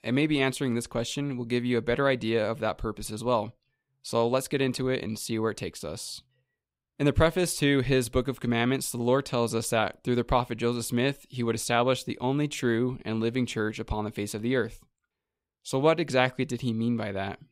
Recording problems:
none

